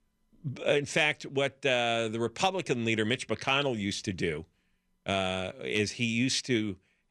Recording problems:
none

